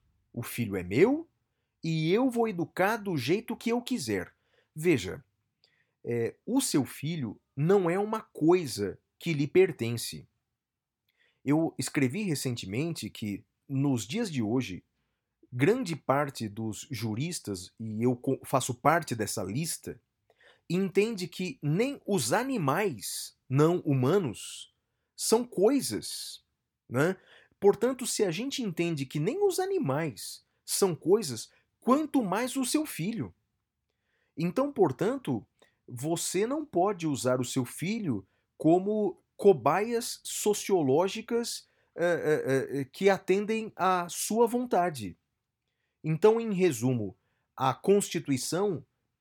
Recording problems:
none

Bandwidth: 18 kHz